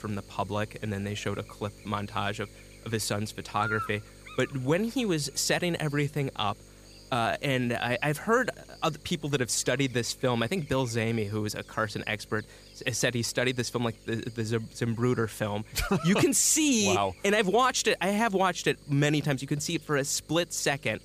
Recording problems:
electrical hum; noticeable; throughout; 50 Hz, 20 dB below the speech

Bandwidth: 15 kHz